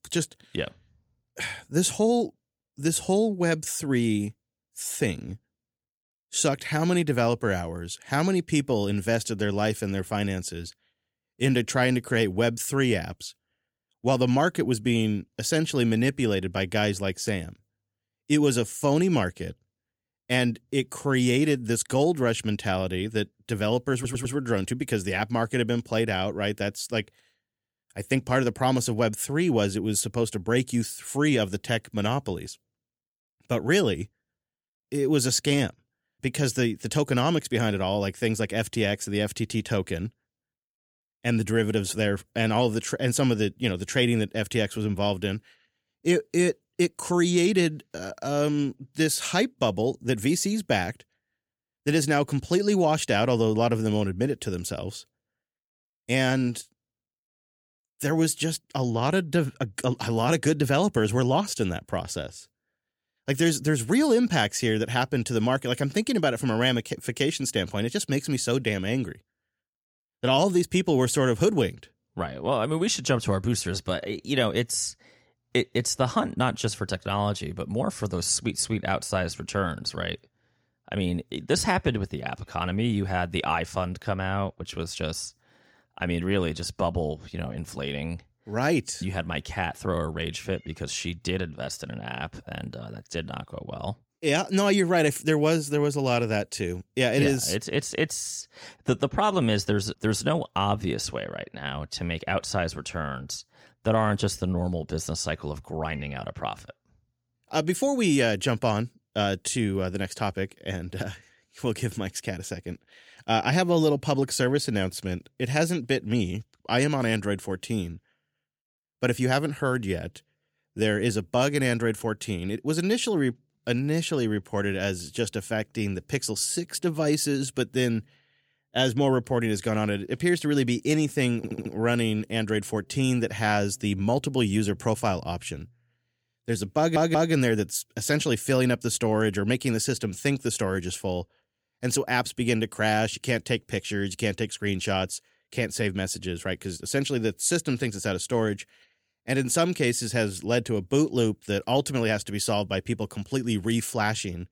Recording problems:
audio stuttering; at 24 s, at 2:11 and at 2:17

